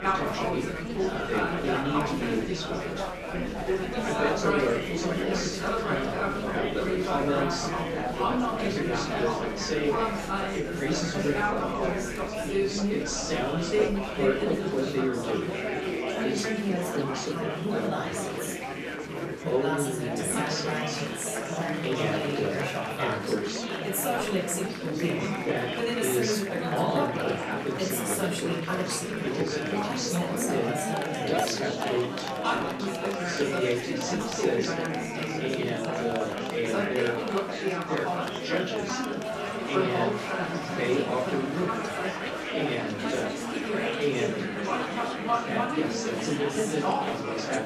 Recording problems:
off-mic speech; far
room echo; noticeable; dies away in 0.6 s
chatter from many people; very loud; throughout; 2 dB above the speech

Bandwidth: 14 kHz